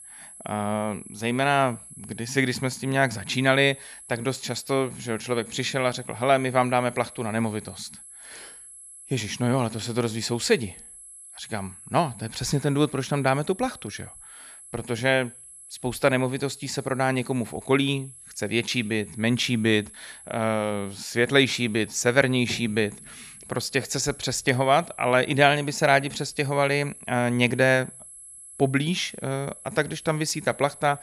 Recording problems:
high-pitched whine; noticeable; throughout; 11 kHz, 20 dB below the speech

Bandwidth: 13.5 kHz